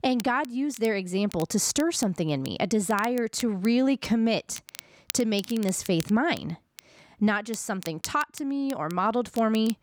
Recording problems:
crackle, like an old record; noticeable; 15 dB below the speech

